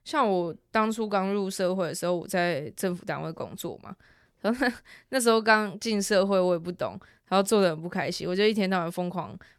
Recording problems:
none

